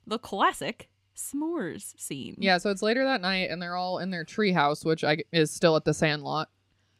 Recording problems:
none

